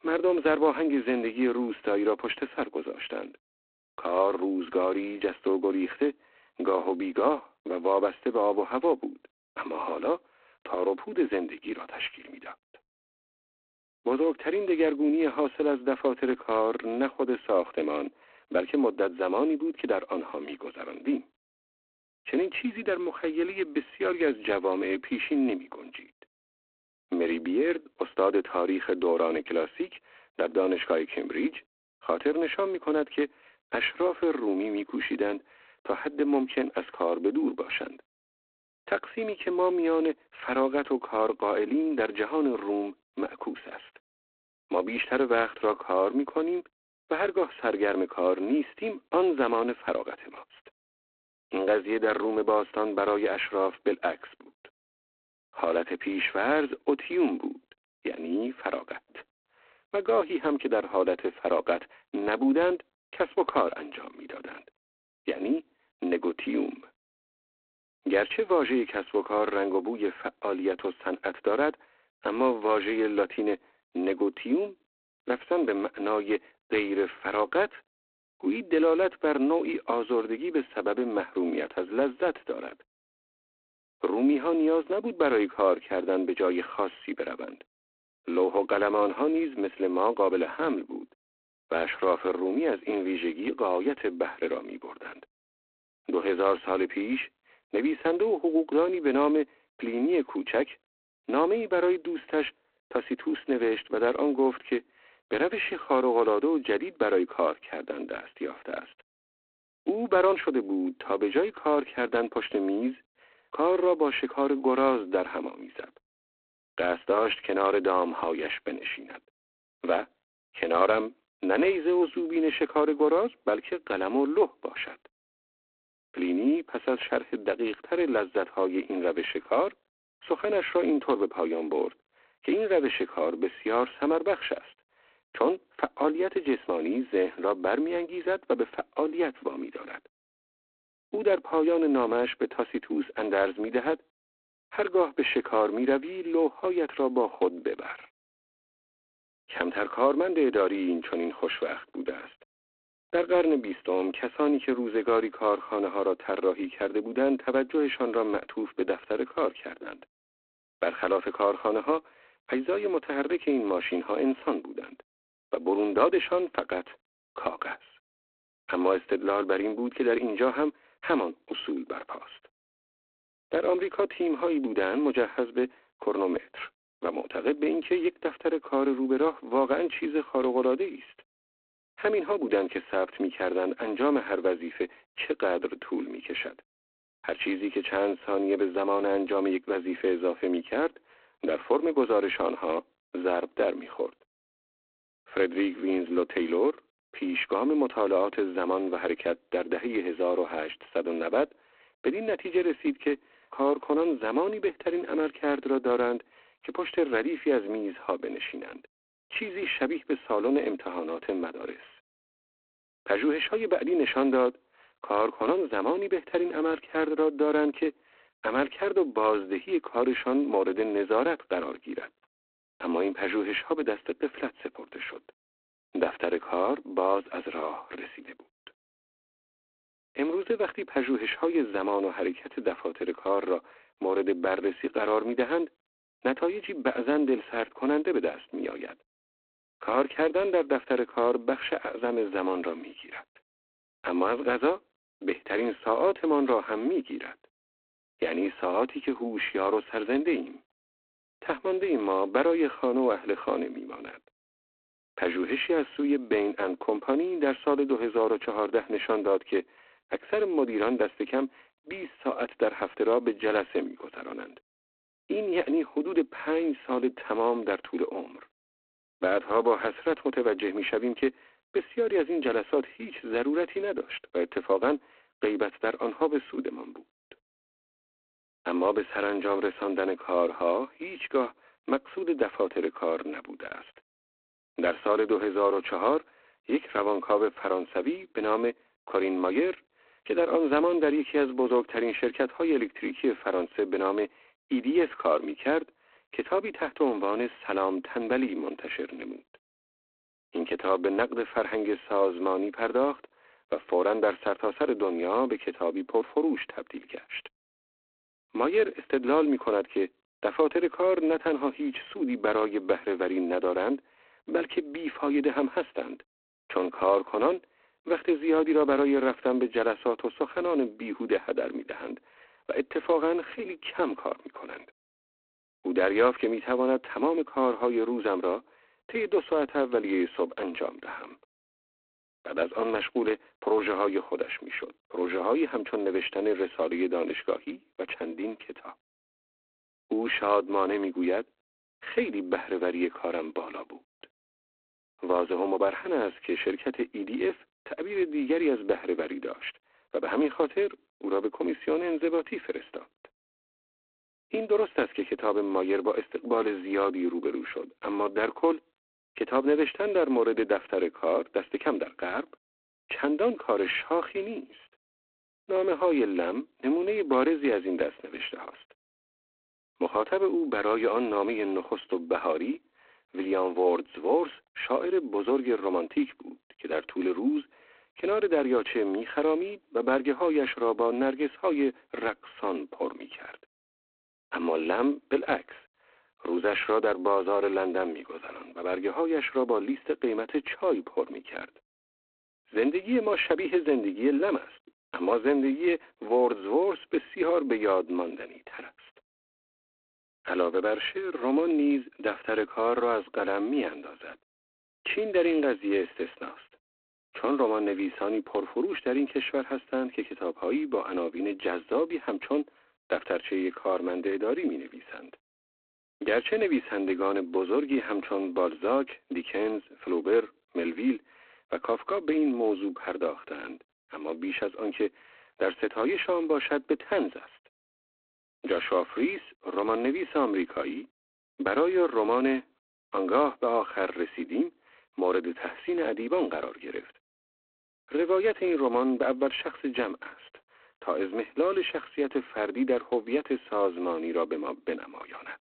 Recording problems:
phone-call audio; poor line; nothing above 4 kHz

